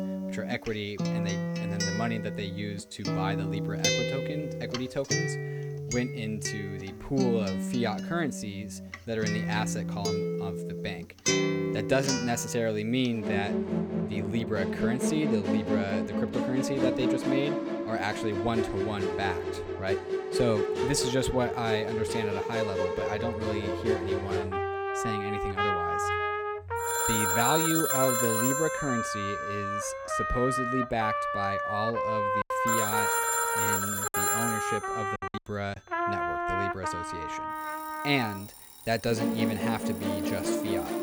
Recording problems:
alarms or sirens; very loud; throughout; as loud as the speech
background music; very loud; throughout; 2 dB above the speech
choppy; very; from 32 to 36 s; 10% of the speech affected

